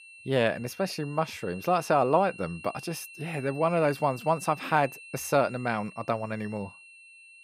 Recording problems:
high-pitched whine; noticeable; throughout; 2.5 kHz, 15 dB below the speech

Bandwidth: 14.5 kHz